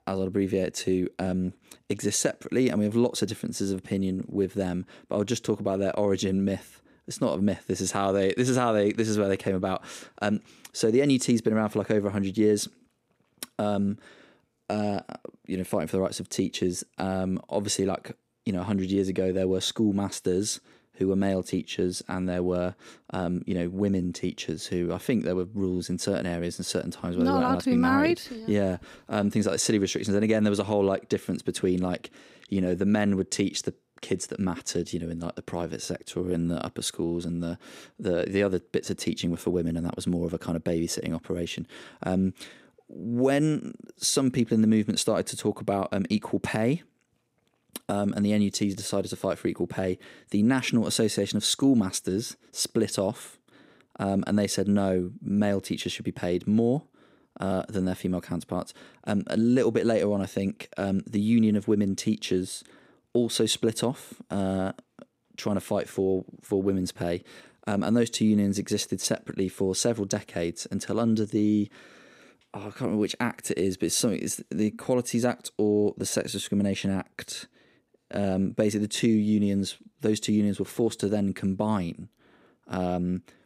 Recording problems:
none

